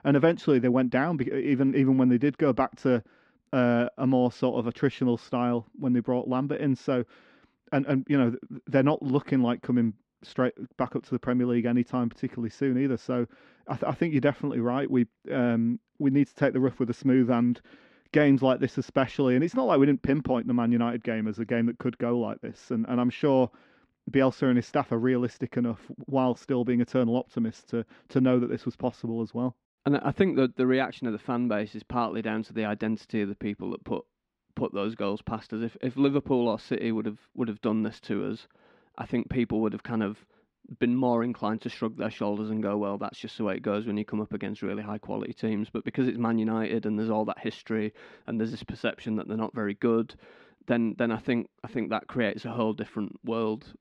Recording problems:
muffled; slightly; fading above 2.5 kHz

